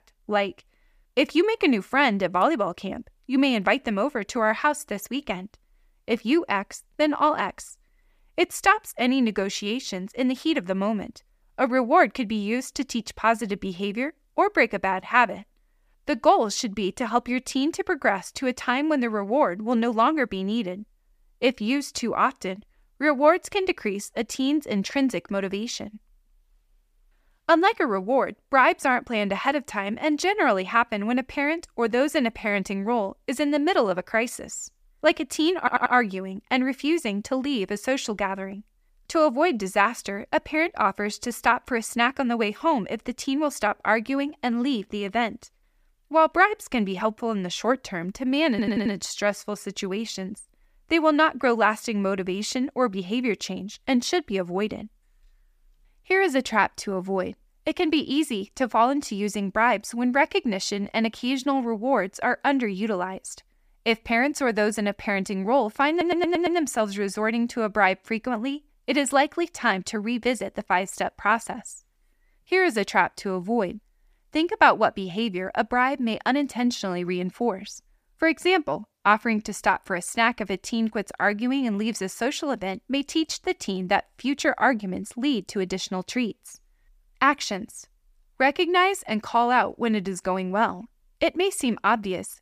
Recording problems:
audio stuttering; at 36 s, at 49 s and at 1:06

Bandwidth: 15 kHz